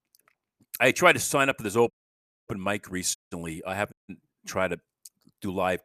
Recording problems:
audio cutting out; at 2 s for 0.5 s, at 3 s and at 4 s

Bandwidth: 14.5 kHz